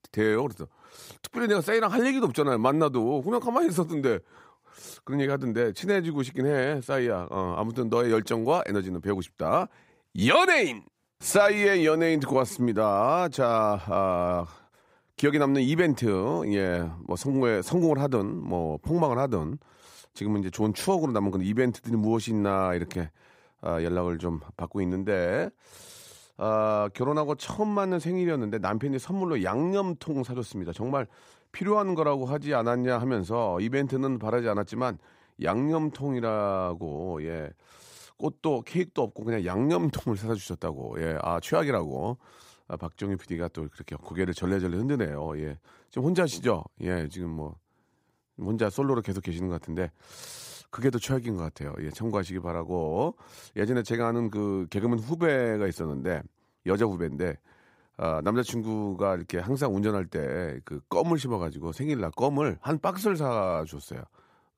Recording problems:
none

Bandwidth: 15.5 kHz